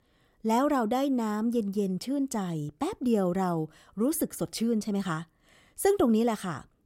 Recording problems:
none

